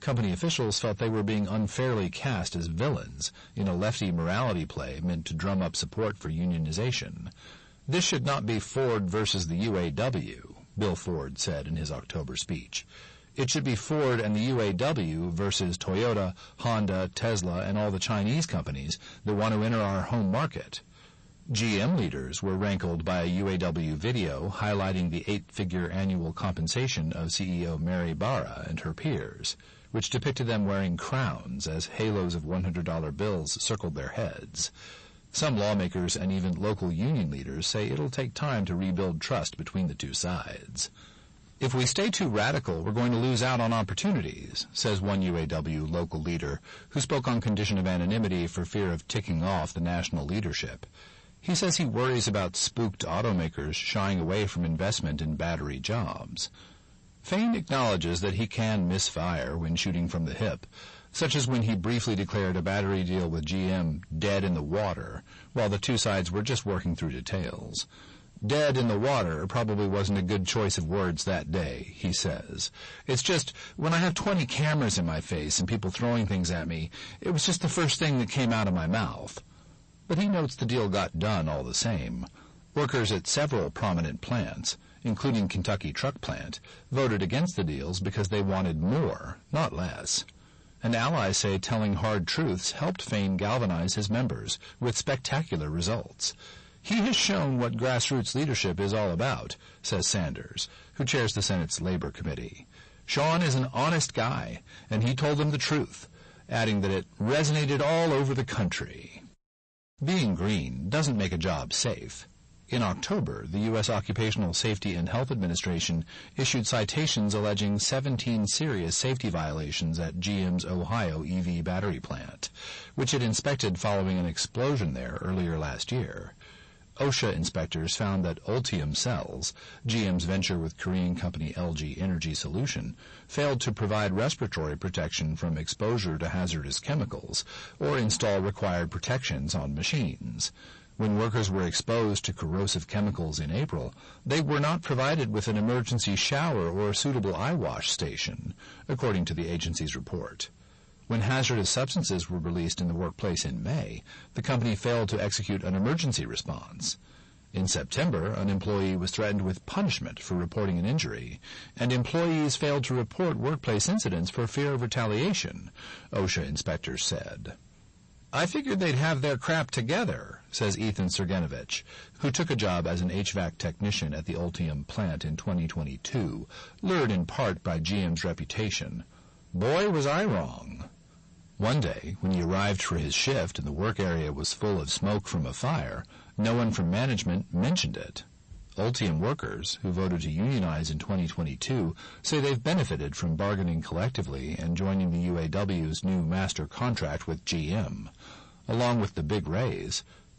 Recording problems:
distortion; heavy; 6 dB below the speech
garbled, watery; slightly; nothing above 8 kHz

